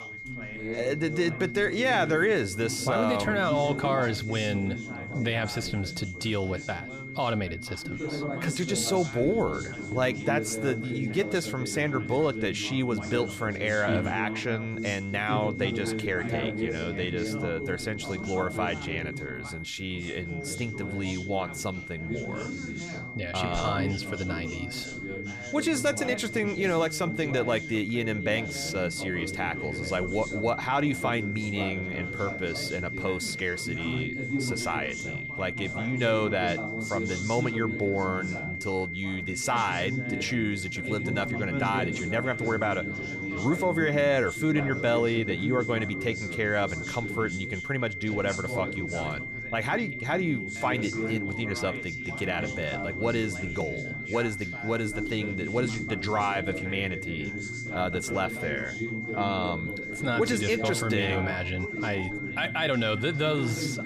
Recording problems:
high-pitched whine; loud; throughout; 2 kHz, 7 dB below the speech
background chatter; loud; throughout; 4 voices, 7 dB below the speech

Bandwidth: 14.5 kHz